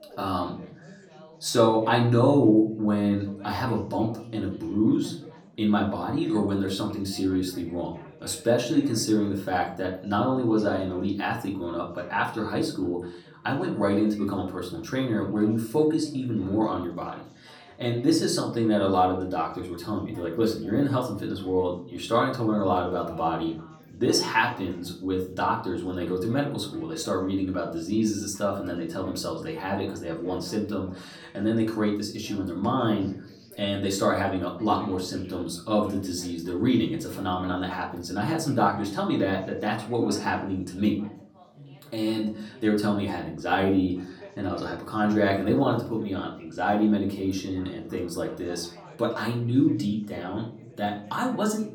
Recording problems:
off-mic speech; far
room echo; slight; dies away in 0.4 s
background chatter; faint; throughout; 4 voices, 25 dB below the speech

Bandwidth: 18 kHz